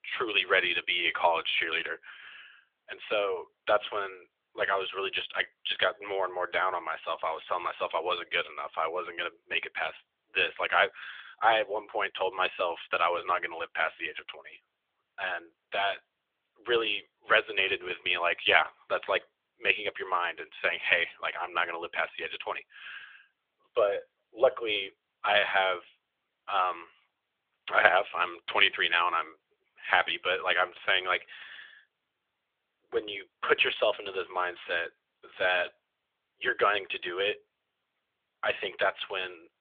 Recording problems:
thin; very; fading below 700 Hz
phone-call audio; nothing above 3.5 kHz

